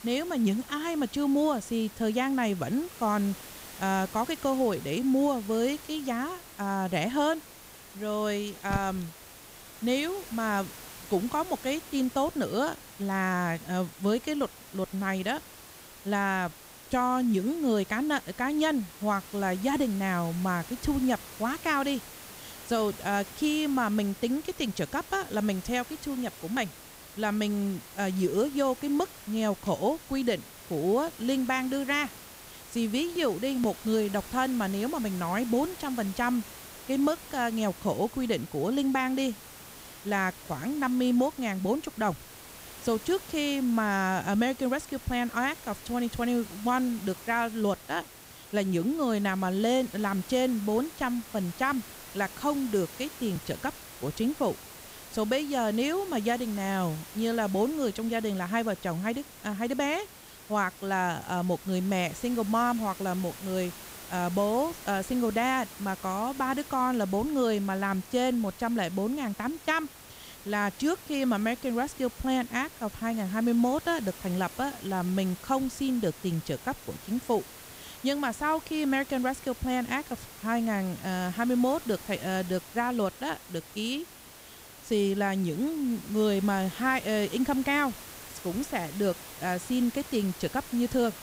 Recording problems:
hiss; noticeable; throughout; 15 dB below the speech

